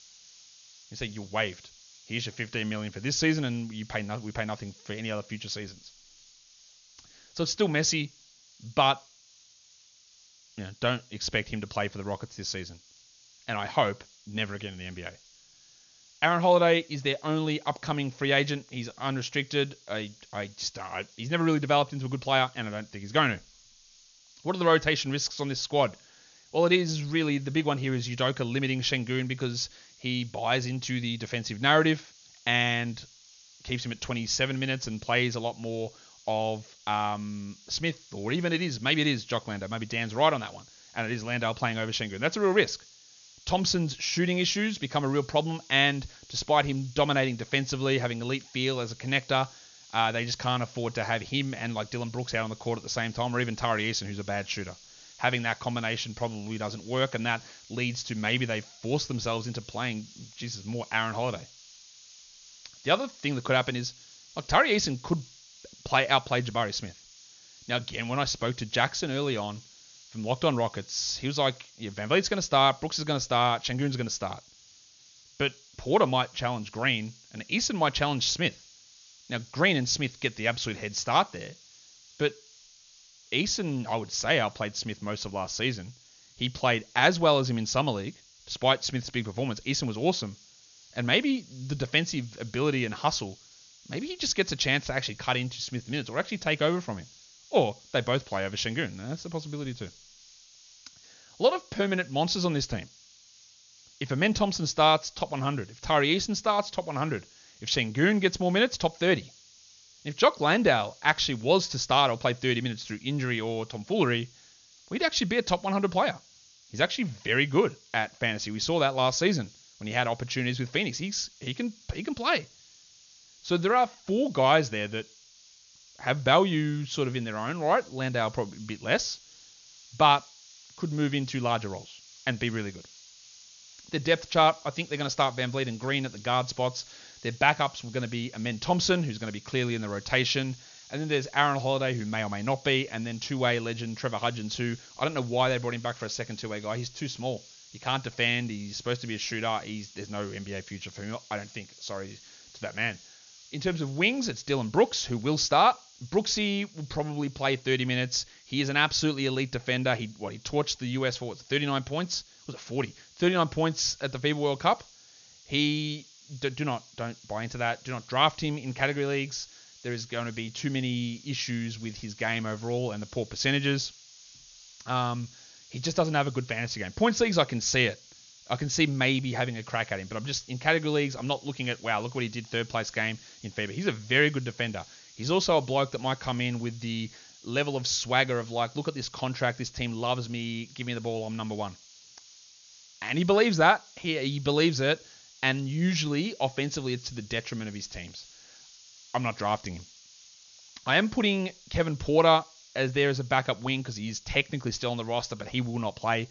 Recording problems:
high frequencies cut off; noticeable; nothing above 7 kHz
hiss; faint; throughout; 25 dB below the speech

